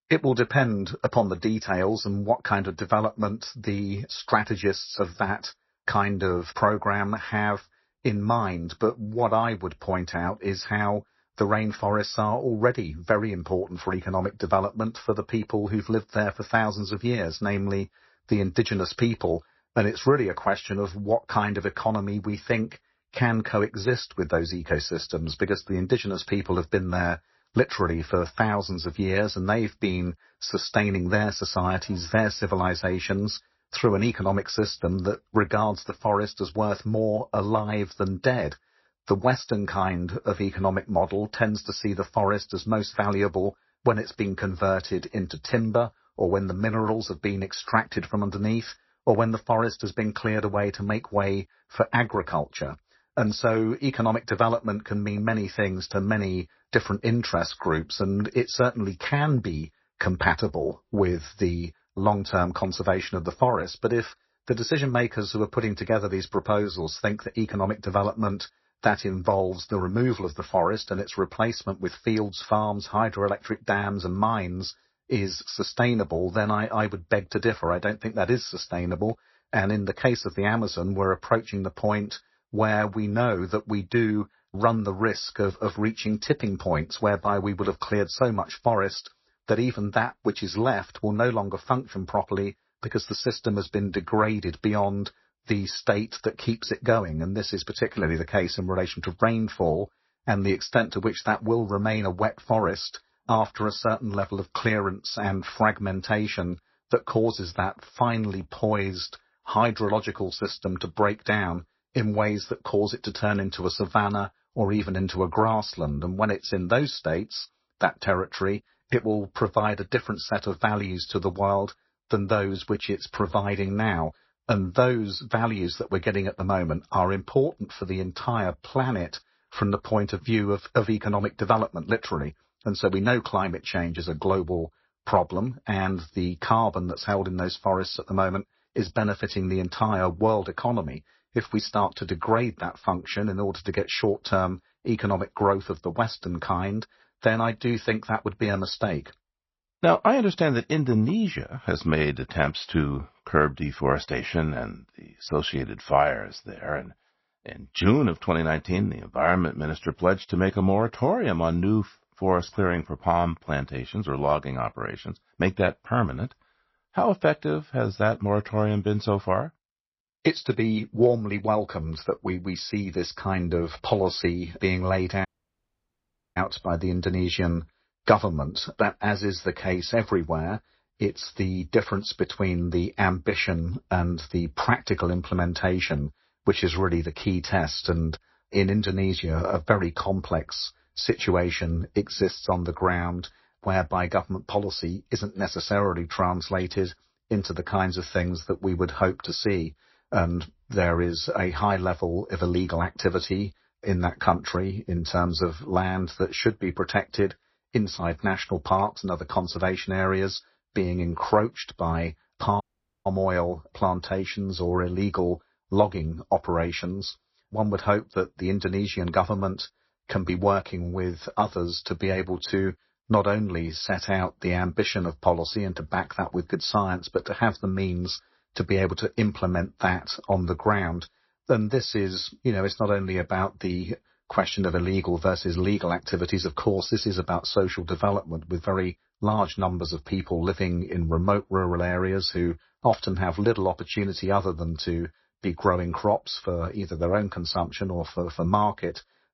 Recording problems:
garbled, watery; slightly; nothing above 5.5 kHz
audio cutting out; at 2:55 for 1 s and at 3:33

